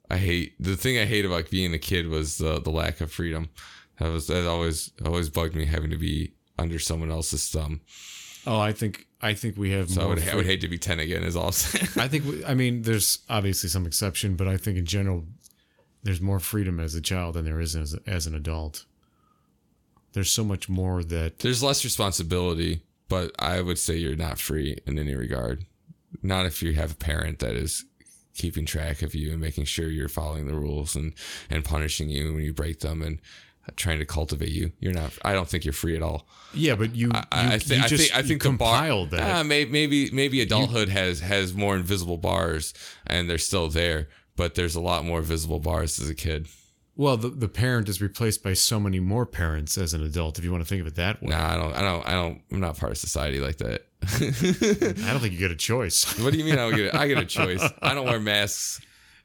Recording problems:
none

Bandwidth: 17.5 kHz